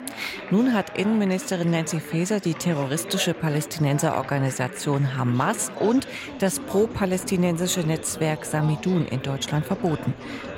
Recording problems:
chatter from many people; noticeable; throughout; 10 dB below the speech

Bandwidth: 16 kHz